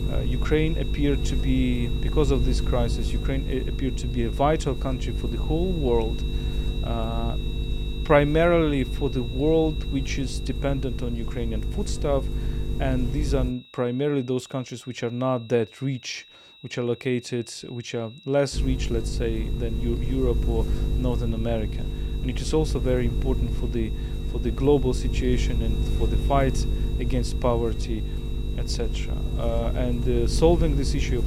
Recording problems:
electrical hum; noticeable; until 14 s and from 19 s on; 50 Hz, 10 dB below the speech
high-pitched whine; noticeable; throughout; 4 kHz, 15 dB below the speech

